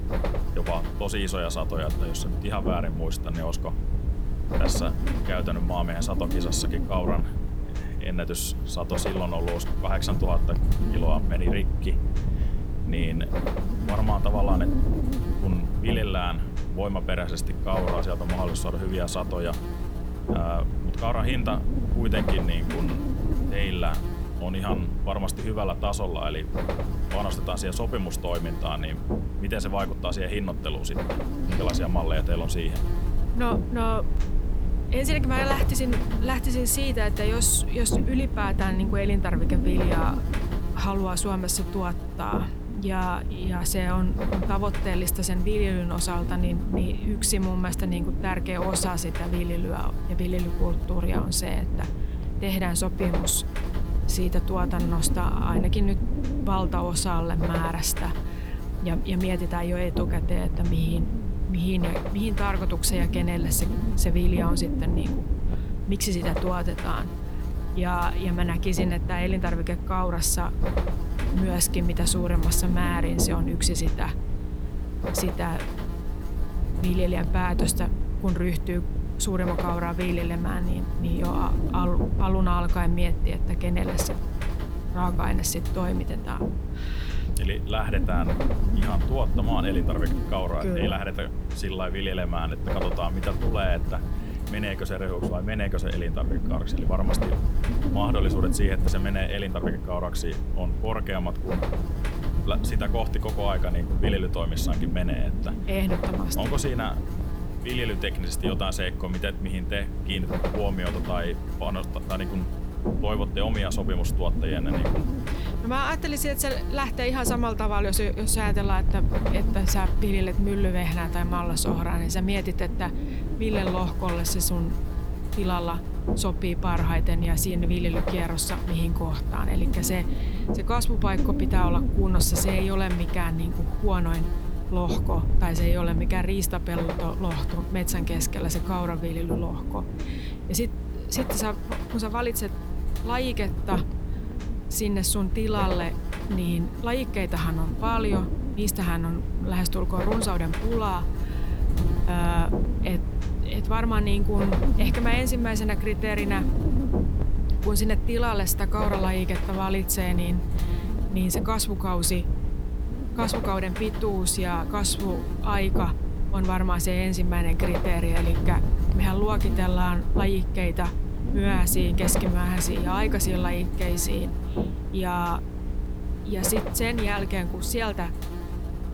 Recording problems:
electrical hum; loud; throughout; 60 Hz, 8 dB below the speech
wind noise on the microphone; occasional gusts; 10 dB below the speech

